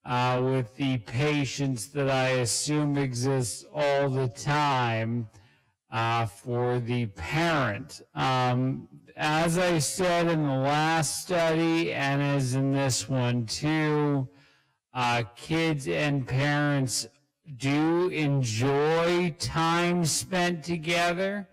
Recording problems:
distortion; heavy; 6 dB below the speech
wrong speed, natural pitch; too slow; 0.5 times normal speed

